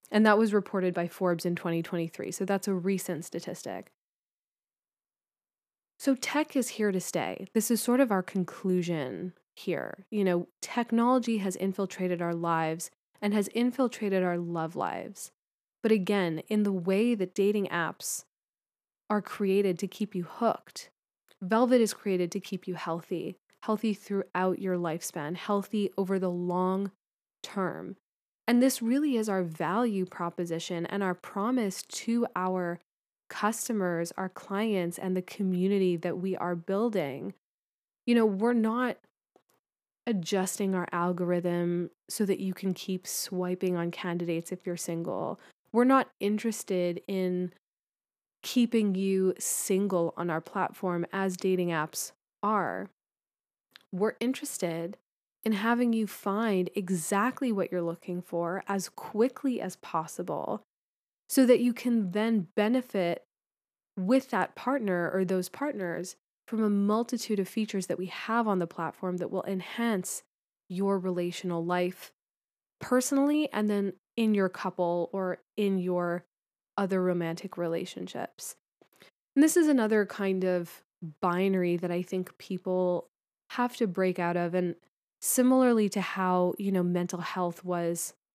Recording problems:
none

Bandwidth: 14.5 kHz